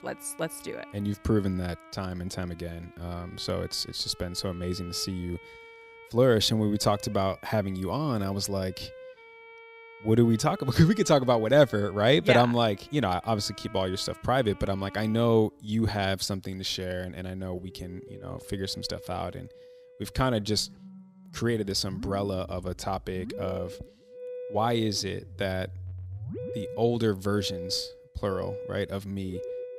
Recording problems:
background music; noticeable; throughout; 15 dB below the speech

